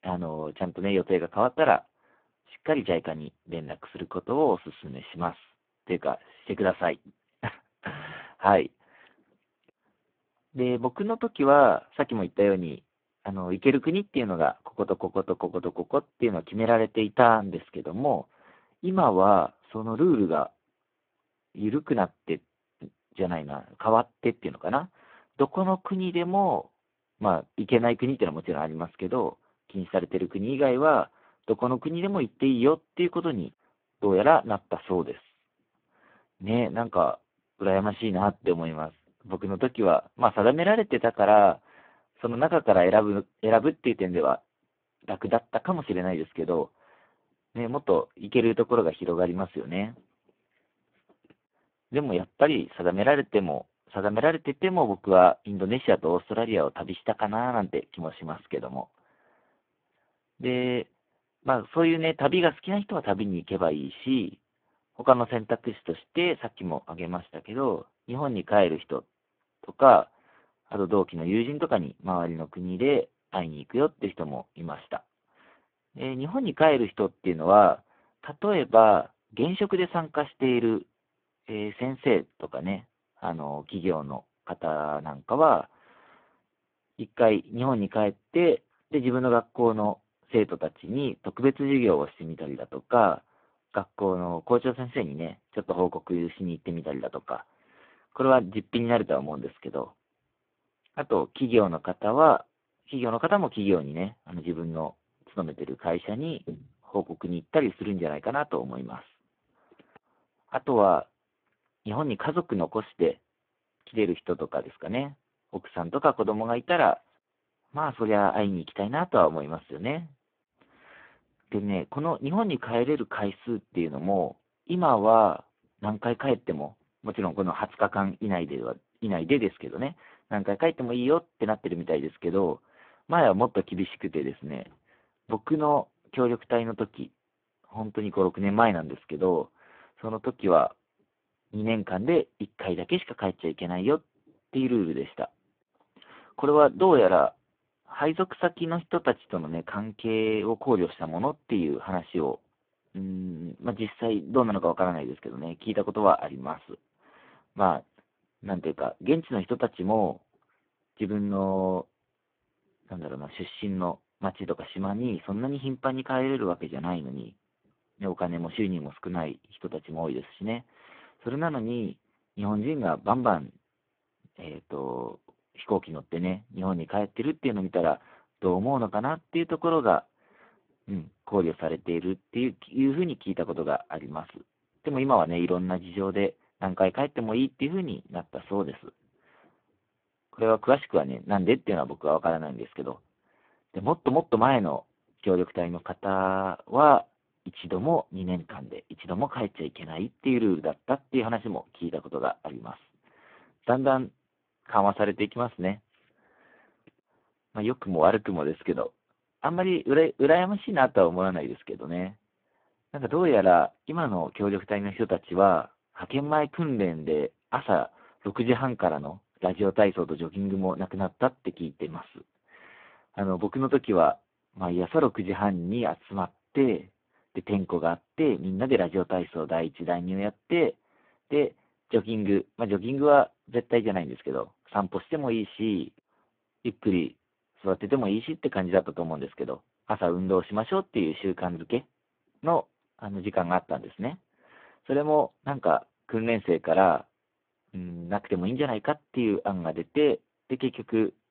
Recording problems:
phone-call audio; poor line

